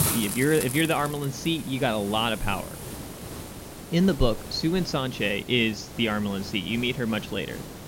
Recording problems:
high frequencies cut off; noticeable; nothing above 7 kHz
hiss; noticeable; throughout; 10 dB below the speech

